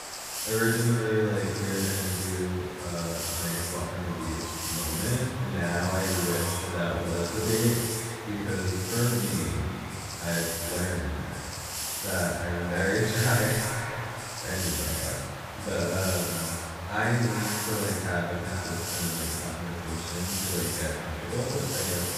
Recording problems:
echo of what is said; strong; throughout; 330 ms later, 10 dB below the speech
room echo; strong; dies away in 1.1 s
off-mic speech; far
hiss; loud; throughout; 2 dB below the speech

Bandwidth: 15 kHz